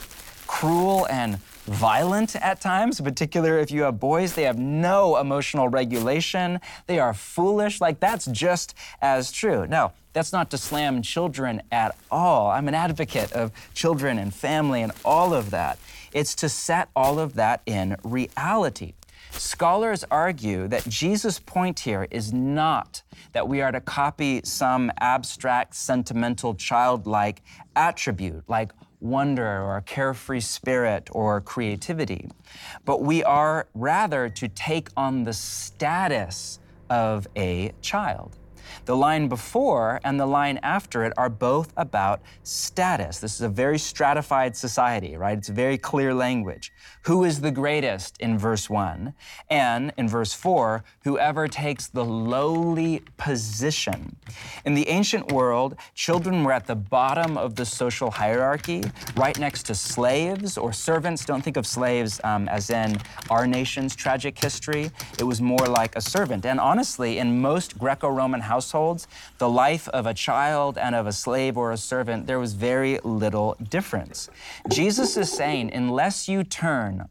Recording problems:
household noises; noticeable; throughout; 15 dB below the speech

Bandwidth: 17 kHz